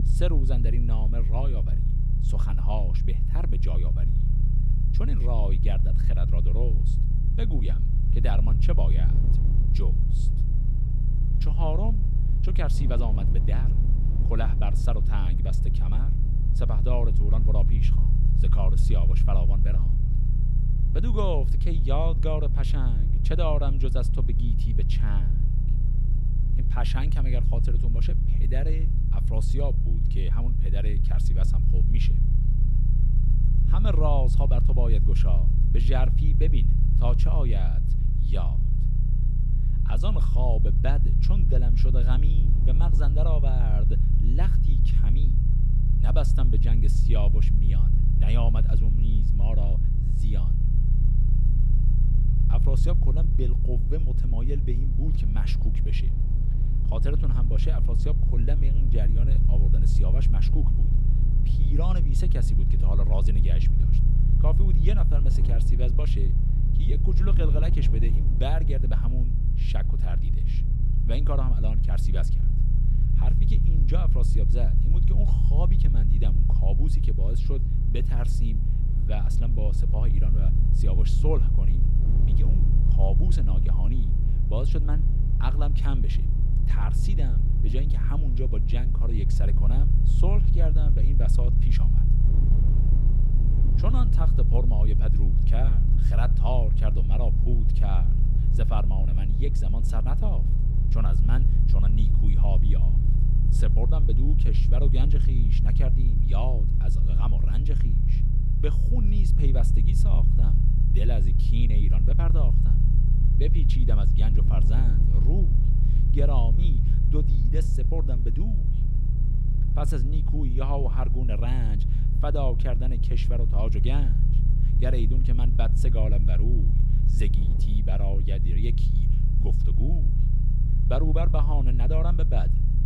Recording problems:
low rumble; loud; throughout; 3 dB below the speech
wind noise on the microphone; occasional gusts; 15 dB below the speech

